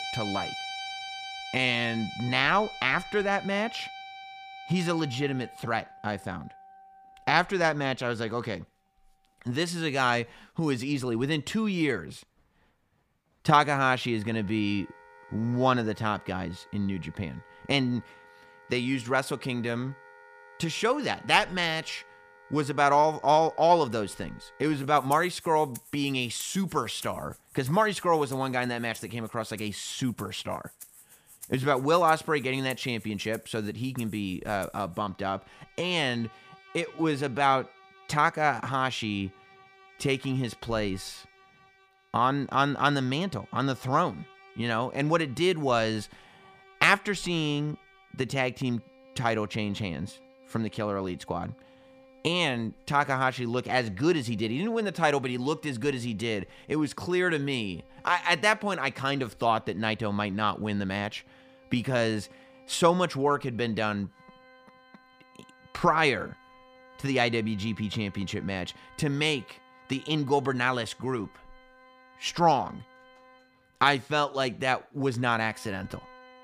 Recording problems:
background music; noticeable; throughout; 20 dB below the speech

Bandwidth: 15 kHz